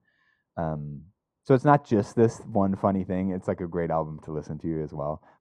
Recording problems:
muffled; very; fading above 1.5 kHz

